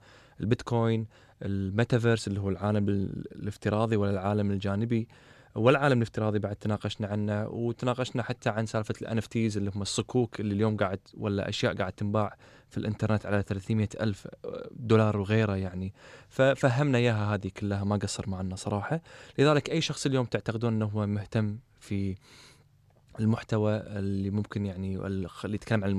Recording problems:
abrupt cut into speech; at the end

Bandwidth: 13.5 kHz